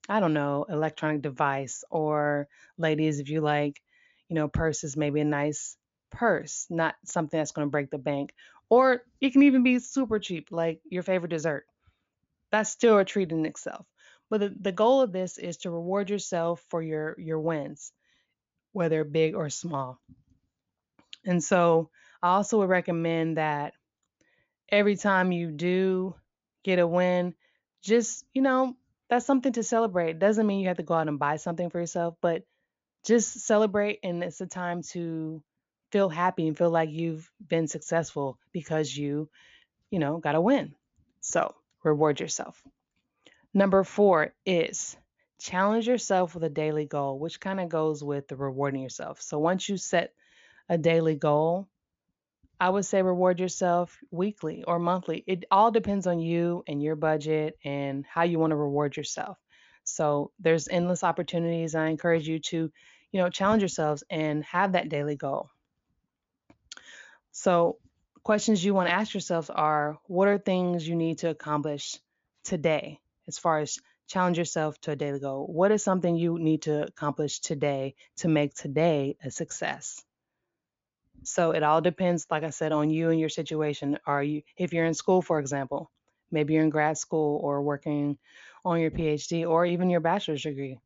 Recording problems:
high frequencies cut off; noticeable; nothing above 7.5 kHz

